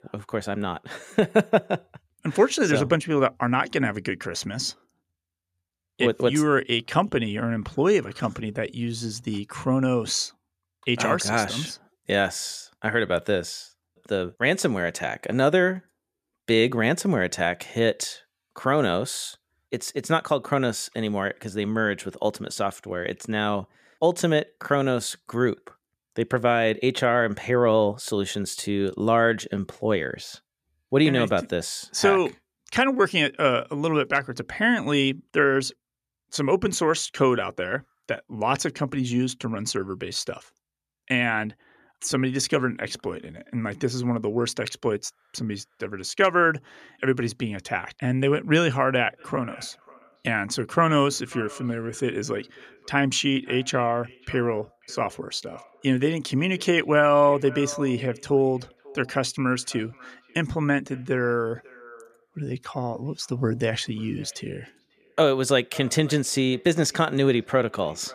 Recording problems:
echo of what is said; faint; from 49 s on; 540 ms later, 20 dB below the speech

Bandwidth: 14.5 kHz